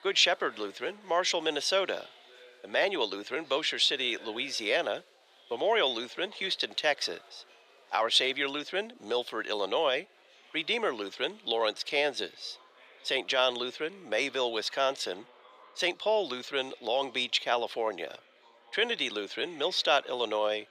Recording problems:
thin; very; fading below 450 Hz
murmuring crowd; faint; throughout; 25 dB below the speech

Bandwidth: 14.5 kHz